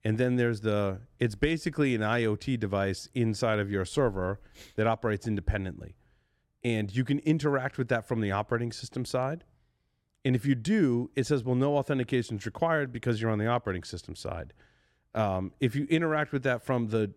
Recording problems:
none

